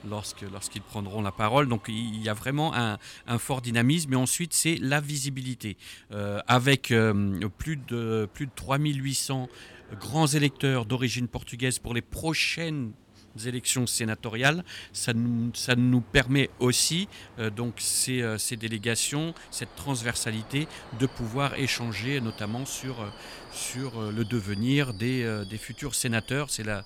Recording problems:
train or aircraft noise; faint; throughout; 20 dB below the speech

